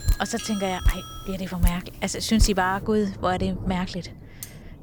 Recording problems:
rain or running water; loud; throughout; 5 dB below the speech
doorbell; noticeable; until 1.5 s; peak 9 dB below the speech
clattering dishes; faint; at 4.5 s; peak 15 dB below the speech

